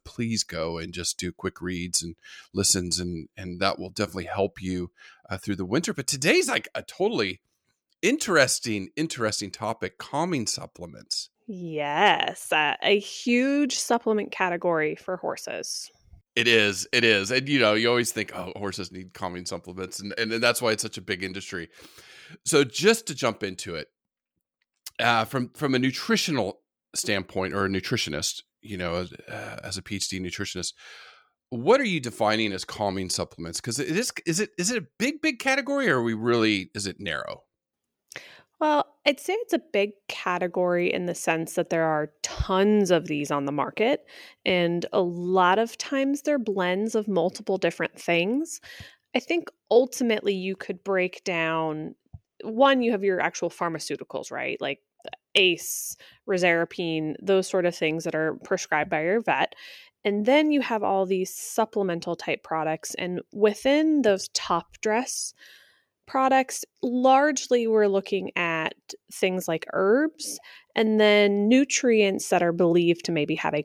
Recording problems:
none

